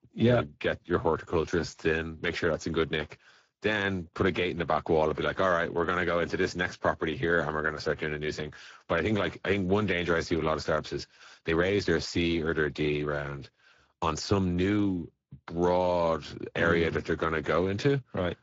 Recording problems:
garbled, watery; slightly; nothing above 7.5 kHz
uneven, jittery; strongly; from 1 to 15 s

